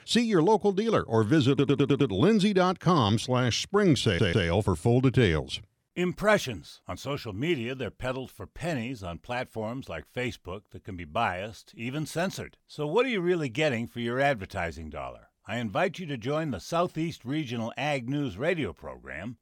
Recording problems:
audio stuttering; at 1.5 s and at 4 s

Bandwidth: 18 kHz